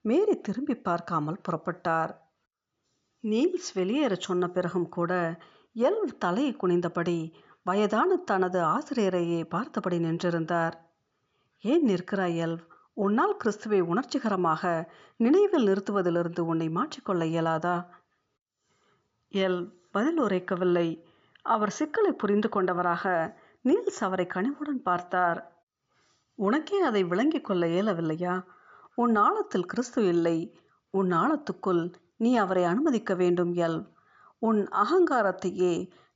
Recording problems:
high frequencies cut off; noticeable; nothing above 7 kHz

